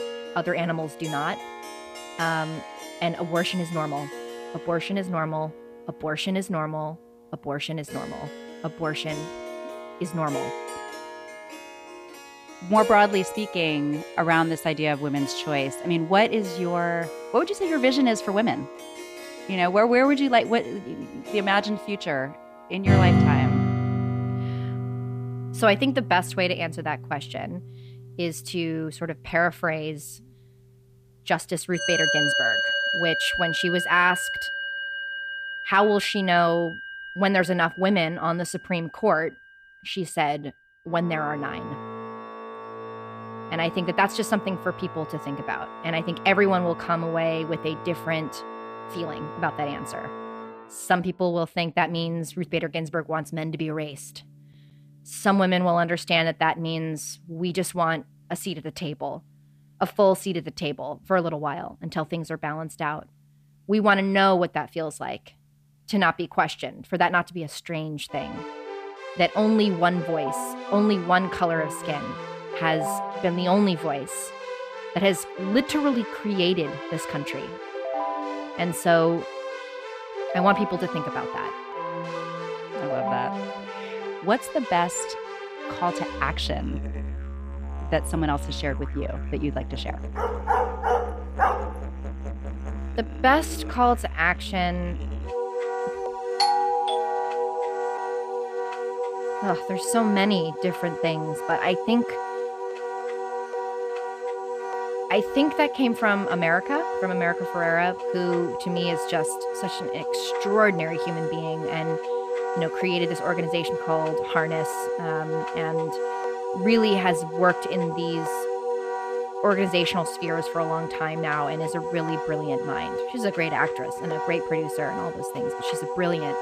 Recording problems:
background music; loud; throughout; 5 dB below the speech
dog barking; loud; from 1:30 to 1:32; peak 2 dB above the speech
doorbell; loud; from 1:36 to 1:38; peak 4 dB above the speech

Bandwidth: 15 kHz